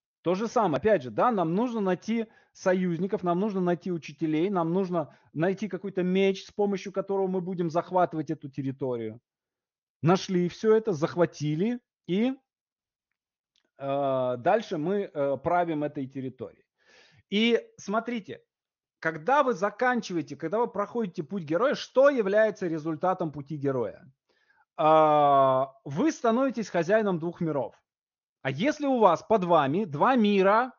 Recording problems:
high frequencies cut off; noticeable; nothing above 6.5 kHz

